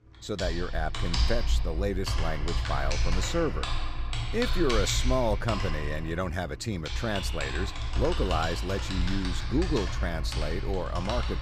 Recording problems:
household noises; loud; throughout; 1 dB below the speech

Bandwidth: 15 kHz